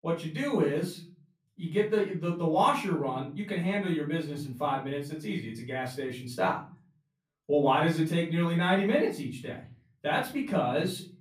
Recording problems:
off-mic speech; far
room echo; slight; dies away in 0.4 s

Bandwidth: 15 kHz